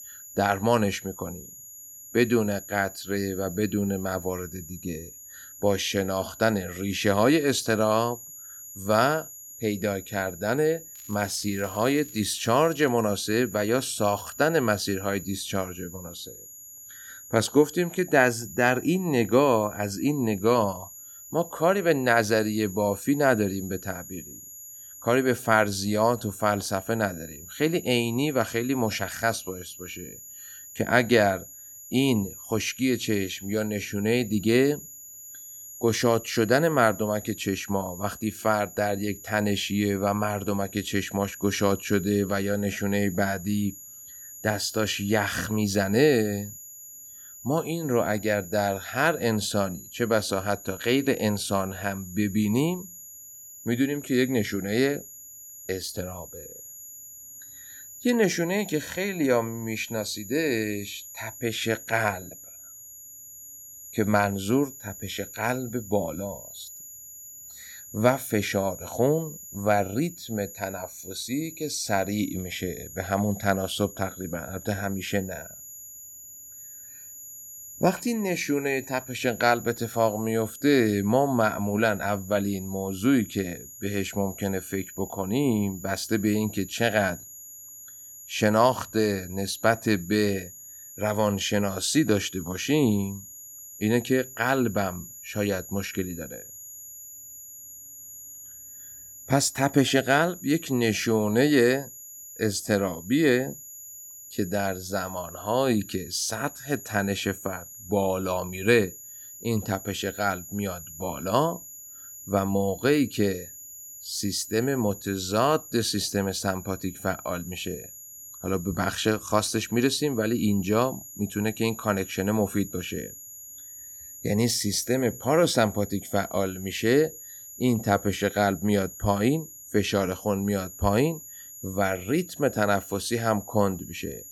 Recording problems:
high-pitched whine; noticeable; throughout; 7 kHz, 15 dB below the speech
crackling; faint; from 11 to 13 s; 25 dB below the speech

